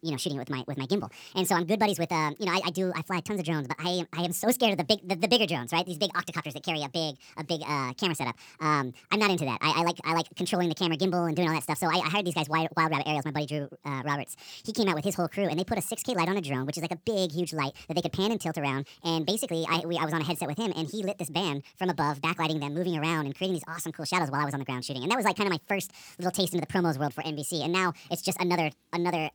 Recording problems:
wrong speed and pitch; too fast and too high; 1.6 times normal speed

